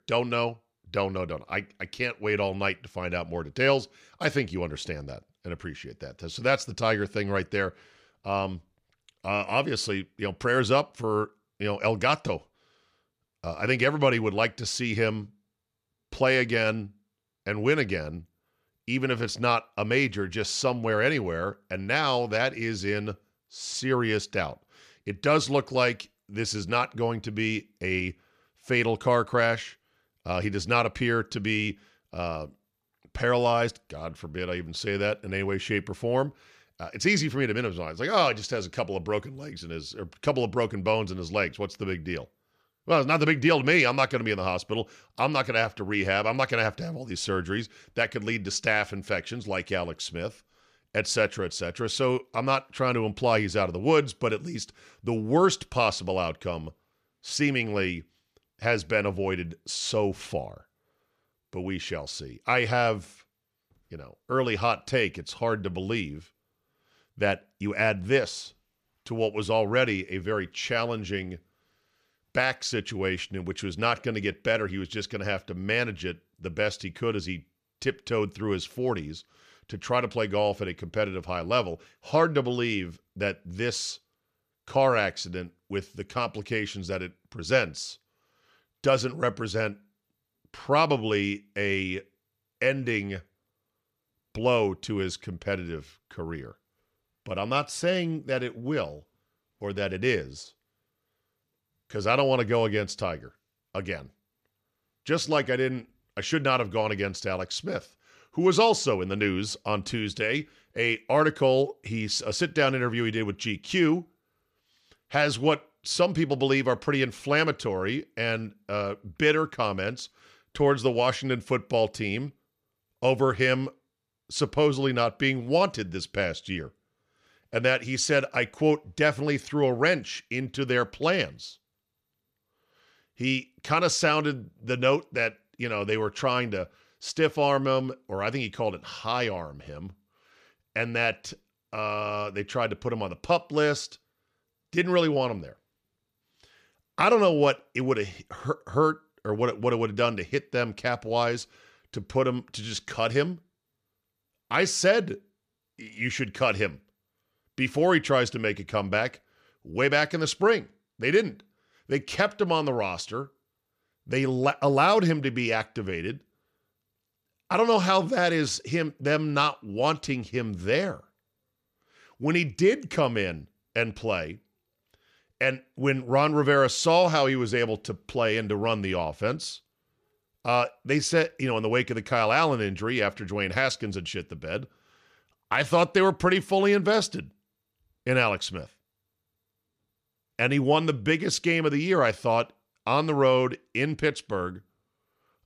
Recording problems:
none

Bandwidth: 14.5 kHz